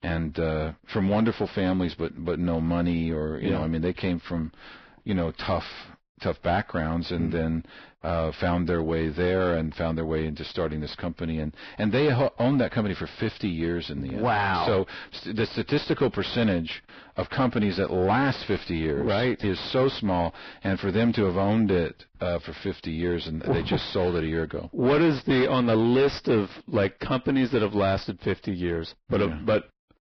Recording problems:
distortion; heavy; 6 dB below the speech
garbled, watery; badly; nothing above 5.5 kHz

